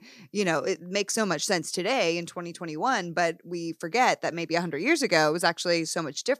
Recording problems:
none

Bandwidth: 14.5 kHz